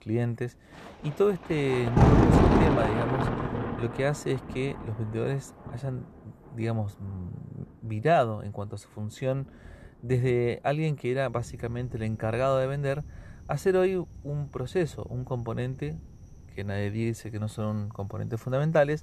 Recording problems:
rain or running water; very loud; throughout; 4 dB above the speech

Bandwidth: 13.5 kHz